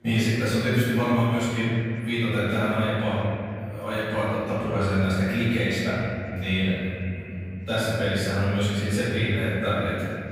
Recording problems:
room echo; strong; dies away in 3 s
off-mic speech; far
background chatter; faint; throughout; 4 voices, 30 dB below the speech

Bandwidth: 15.5 kHz